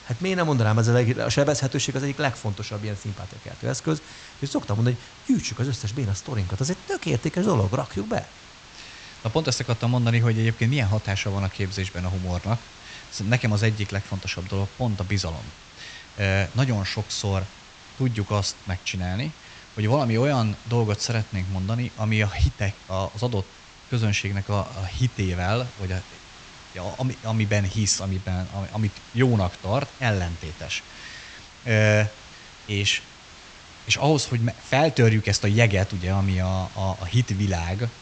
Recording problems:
high frequencies cut off; noticeable; nothing above 8 kHz
hiss; noticeable; throughout; 20 dB below the speech

